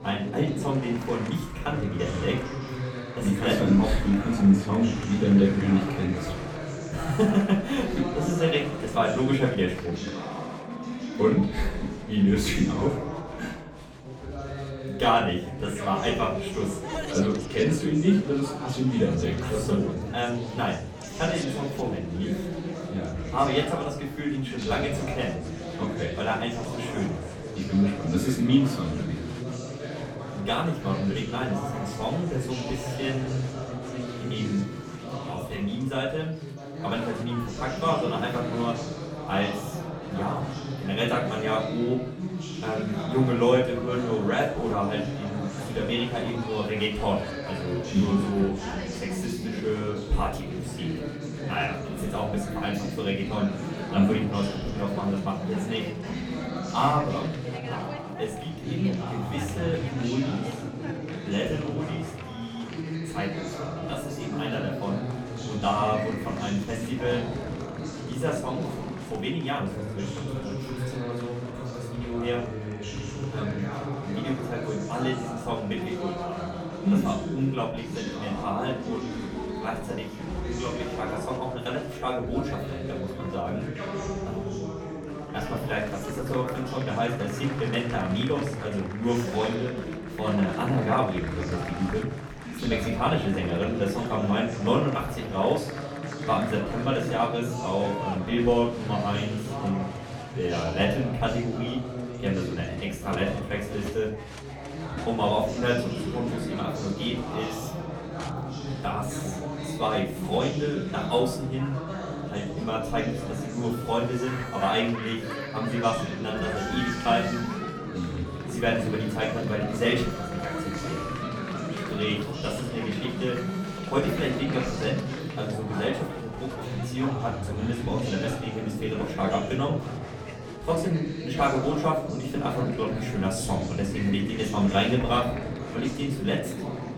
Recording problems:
off-mic speech; far
room echo; slight; dies away in 0.4 s
chatter from many people; loud; throughout; 6 dB below the speech
background music; faint; throughout; 20 dB below the speech

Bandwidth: 17.5 kHz